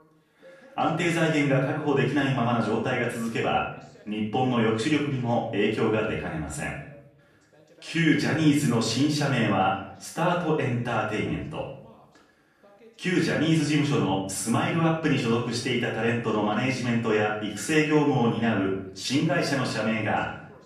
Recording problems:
off-mic speech; far
room echo; noticeable; dies away in 0.6 s
voice in the background; faint; throughout; 30 dB below the speech

